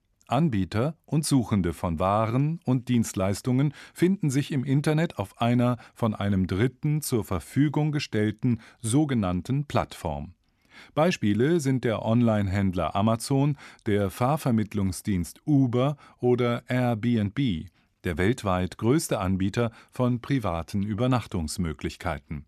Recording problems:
none

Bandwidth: 13.5 kHz